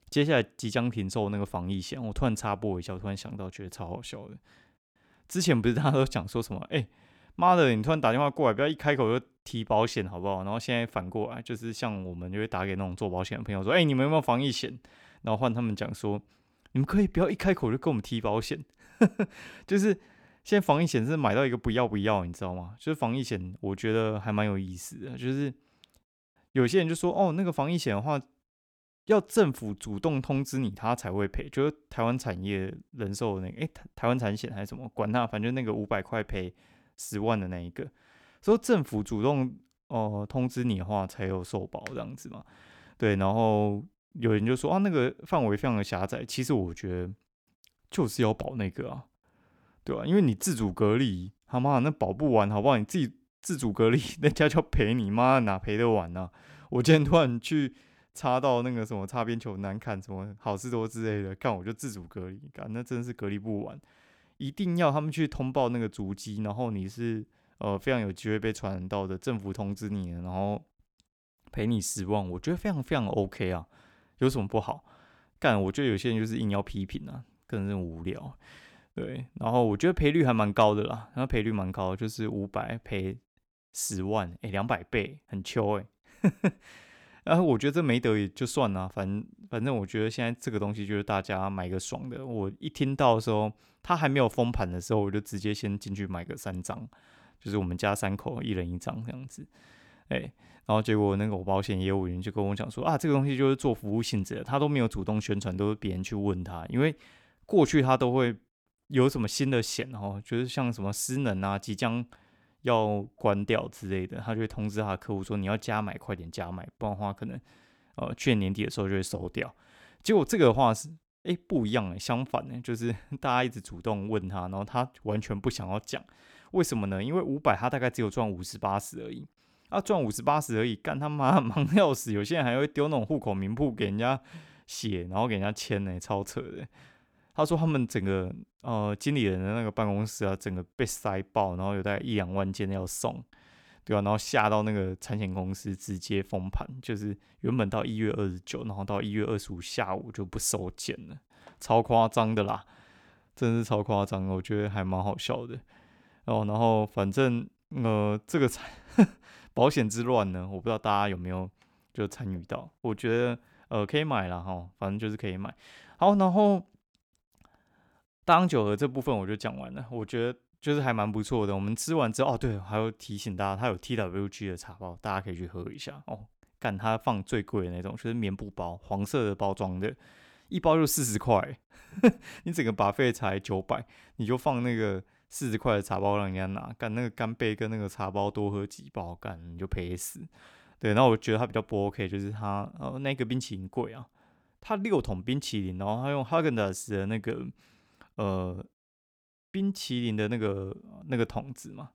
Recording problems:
none

